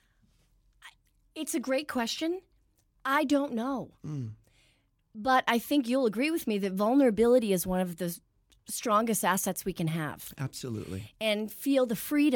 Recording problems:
abrupt cut into speech; at the end

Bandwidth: 17.5 kHz